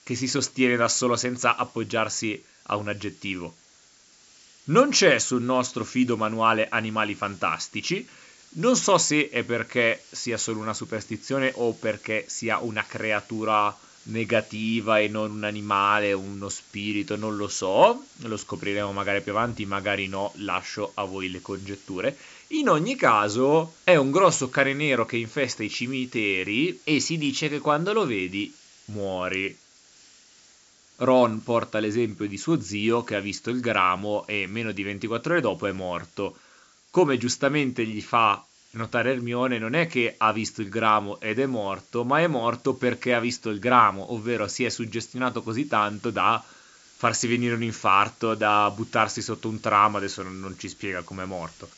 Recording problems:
high frequencies cut off; noticeable; nothing above 8 kHz
hiss; faint; throughout; 25 dB below the speech

